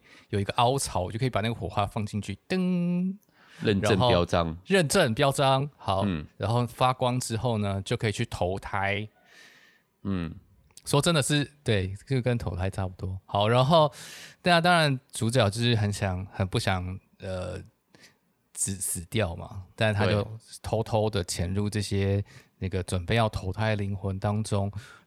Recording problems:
none

